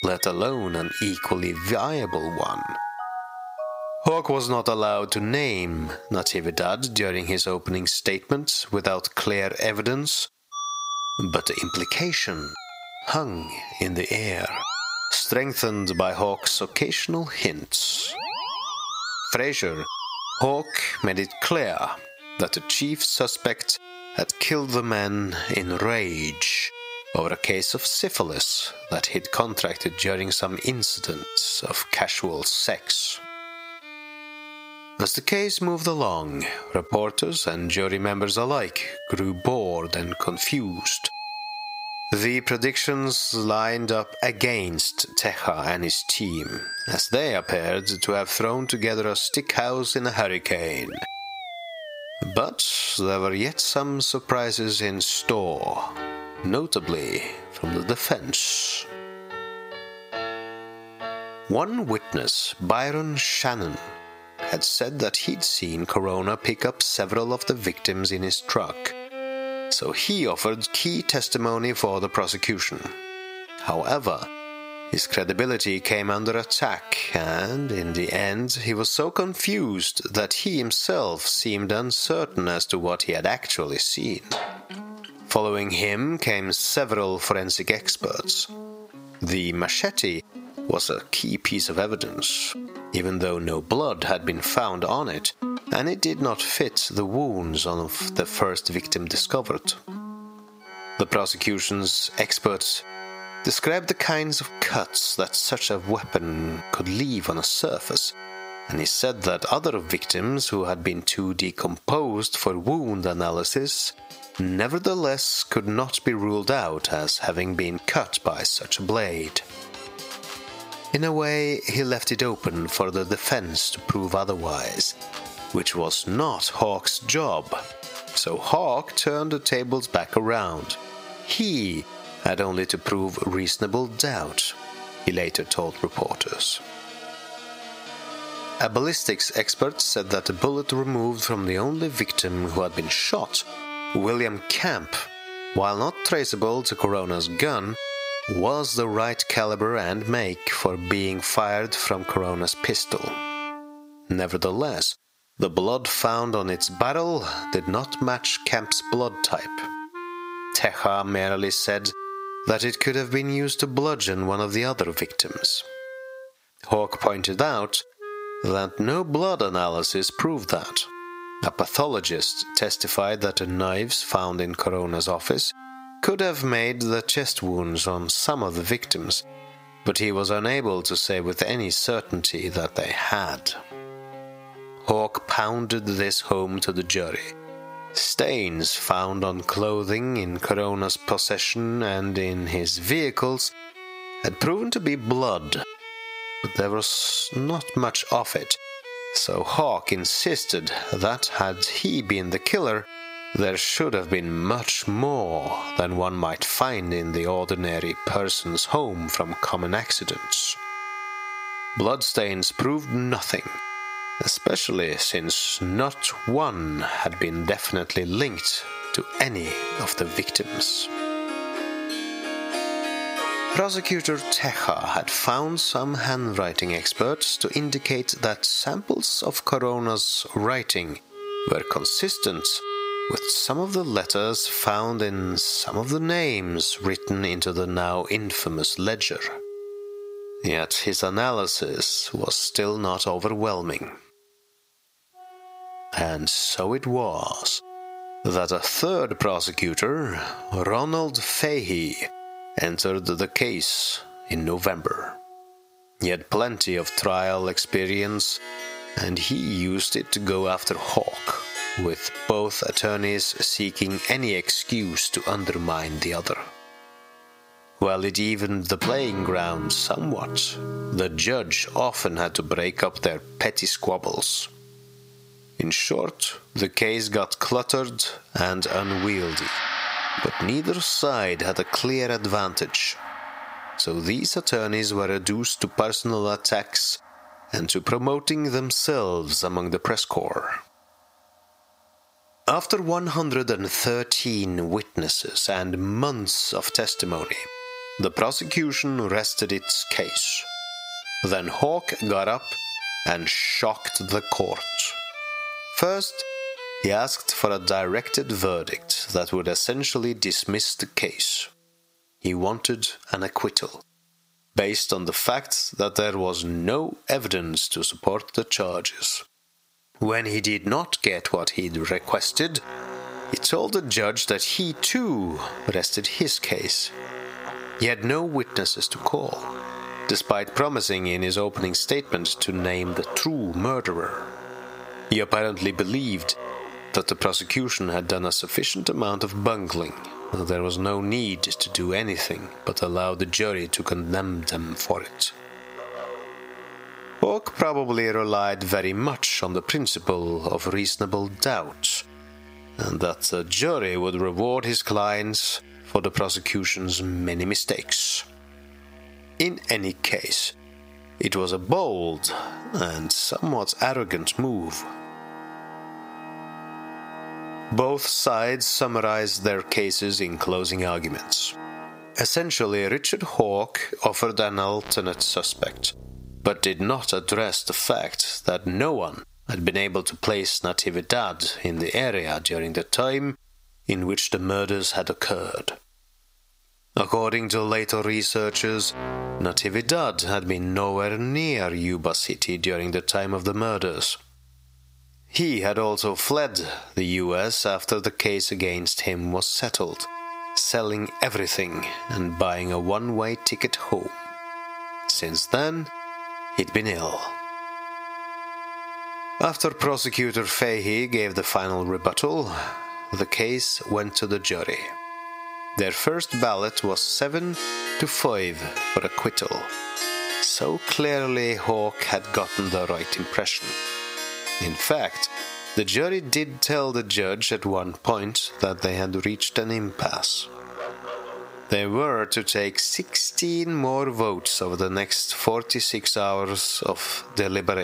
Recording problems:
squashed, flat; heavily, background pumping
thin; very slightly; fading below 750 Hz
background music; noticeable; throughout; 15 dB below the speech
abrupt cut into speech; at the end

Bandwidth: 15.5 kHz